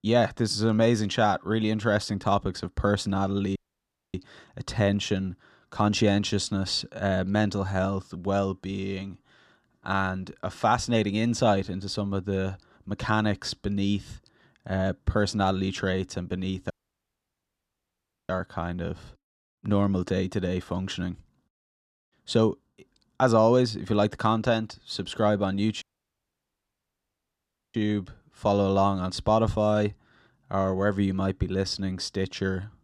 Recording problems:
audio cutting out; at 3.5 s for 0.5 s, at 17 s for 1.5 s and at 26 s for 2 s

